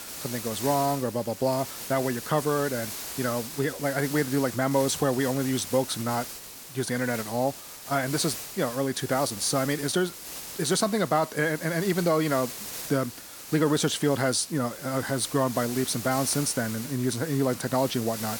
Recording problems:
hiss; loud; throughout; 9 dB below the speech

